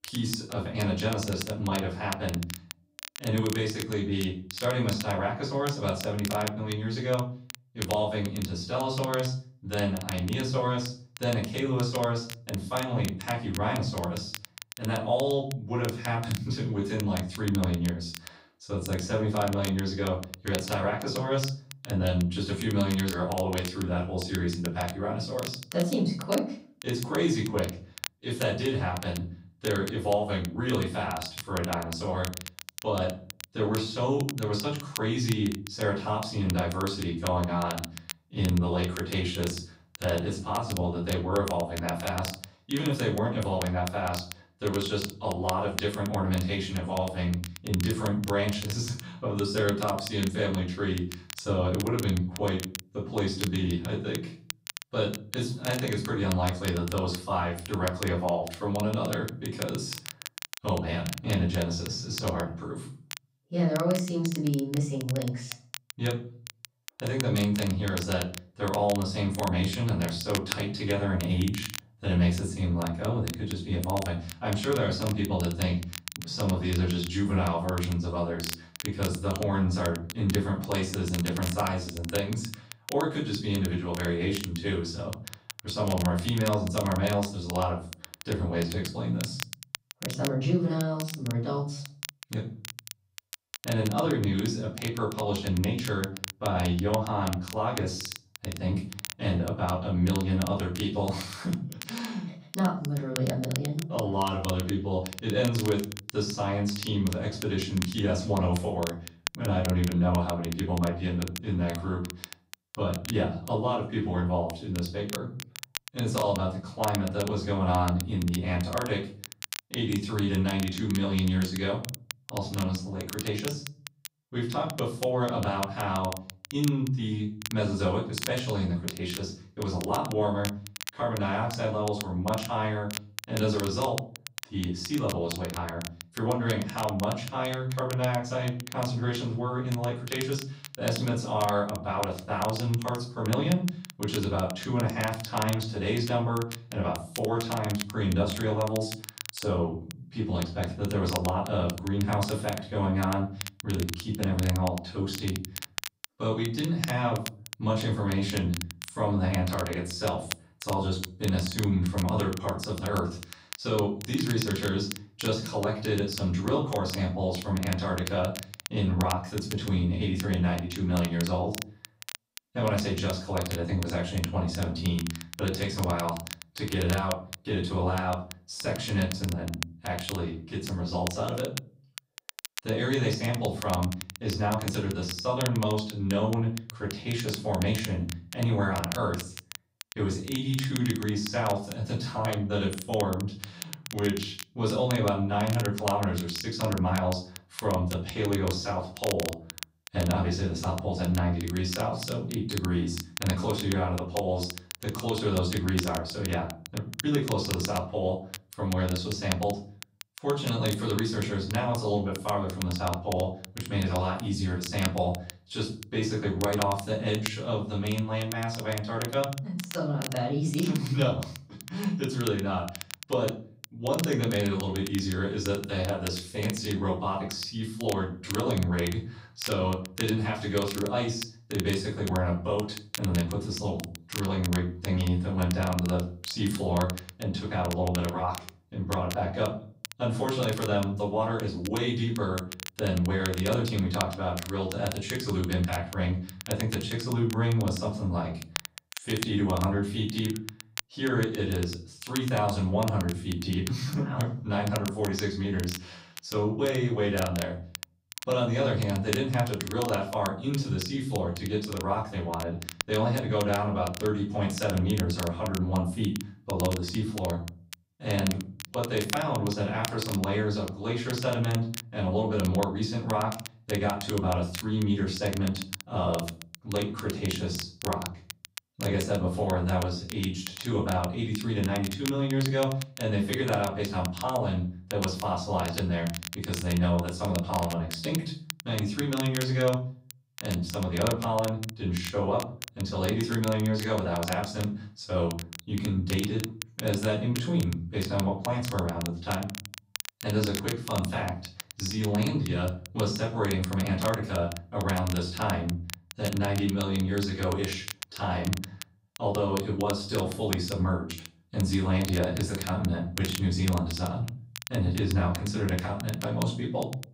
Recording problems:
off-mic speech; far
room echo; slight; dies away in 0.4 s
crackle, like an old record; noticeable; 10 dB below the speech

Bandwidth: 15.5 kHz